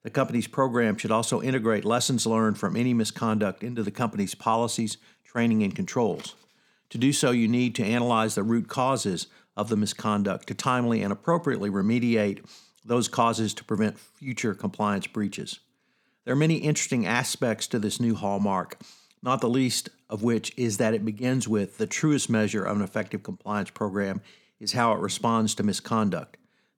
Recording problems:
none

